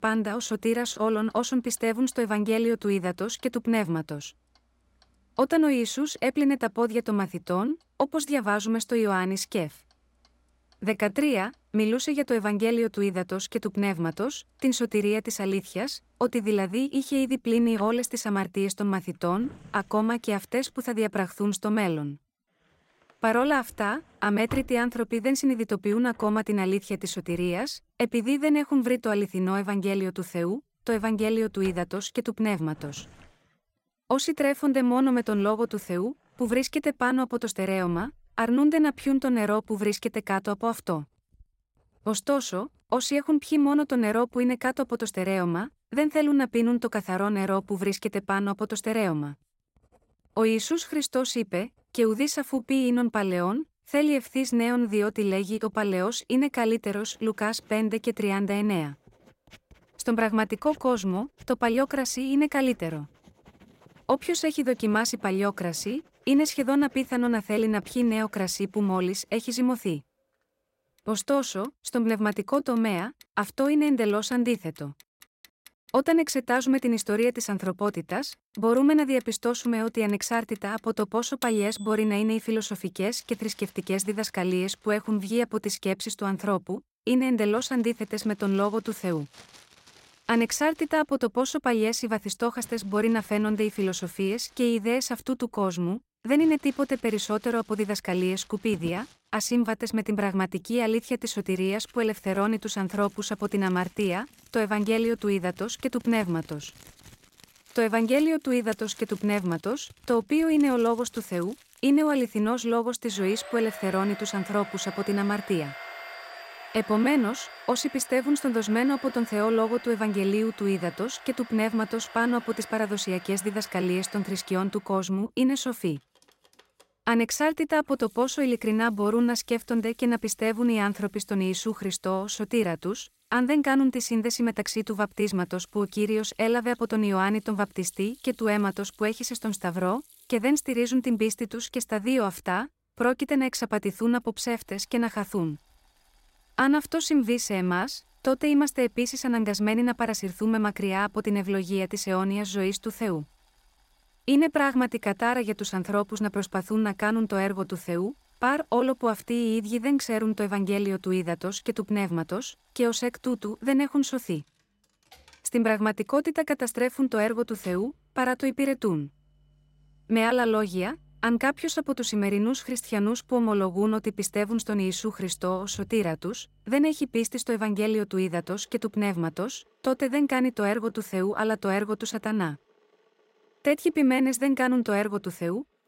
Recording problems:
household noises; faint; throughout; 20 dB below the speech

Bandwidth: 16 kHz